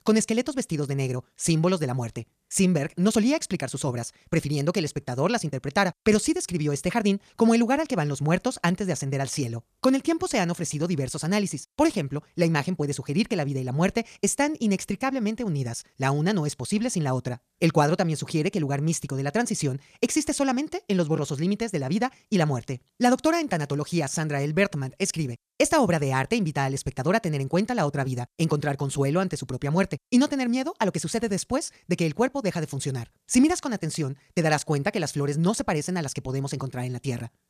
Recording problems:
wrong speed, natural pitch; too fast; 1.5 times normal speed

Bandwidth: 14.5 kHz